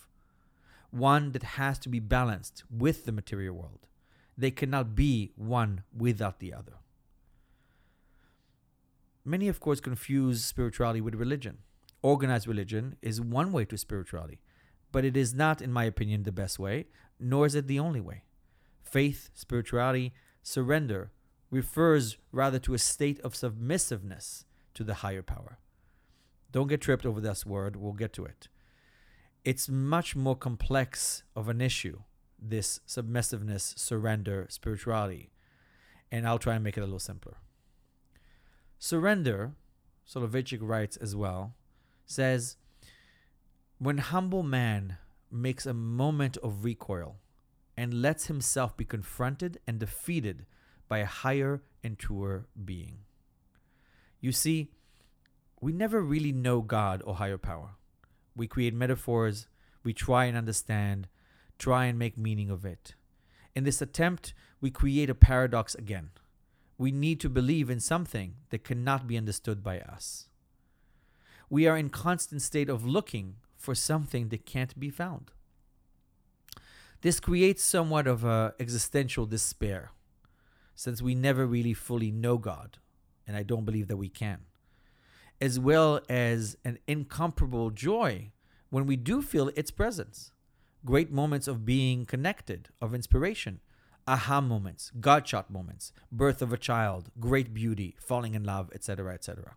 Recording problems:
none

